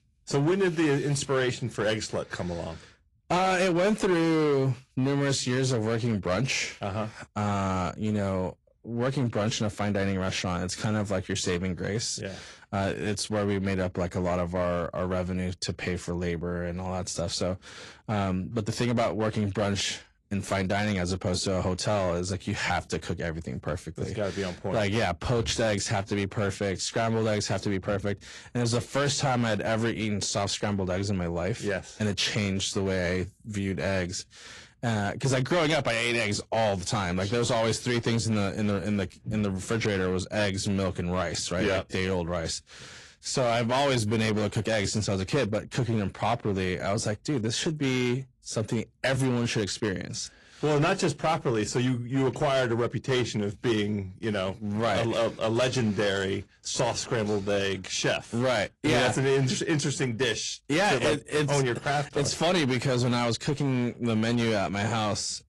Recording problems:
distortion; slight; 6% of the sound clipped
garbled, watery; slightly

